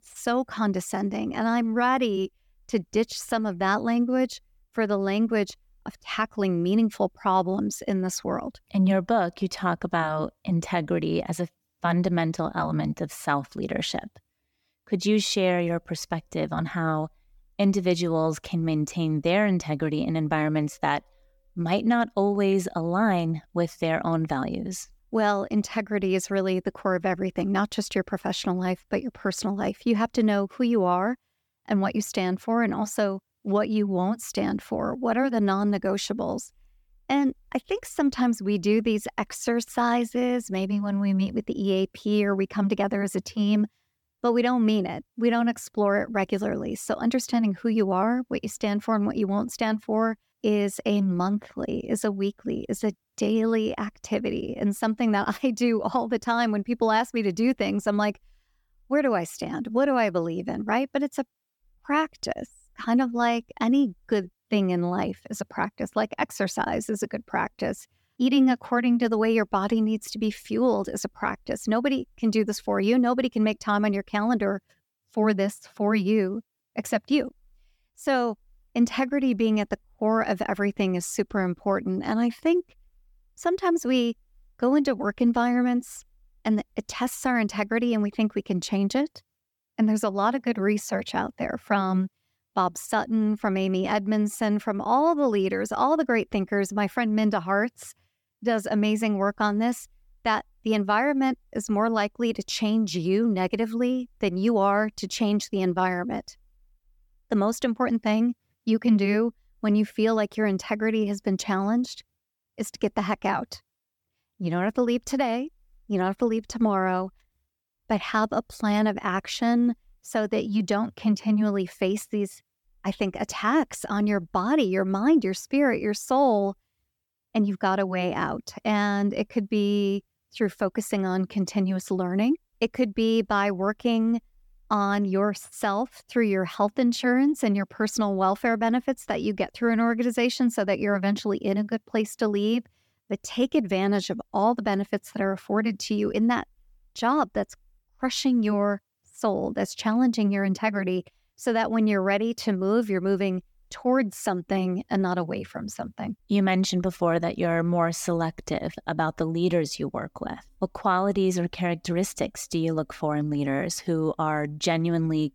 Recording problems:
none

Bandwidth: 18 kHz